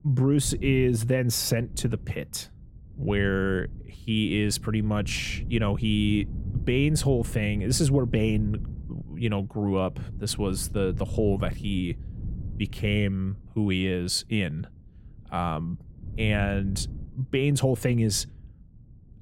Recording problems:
wind noise on the microphone; occasional gusts; 20 dB below the speech

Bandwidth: 16.5 kHz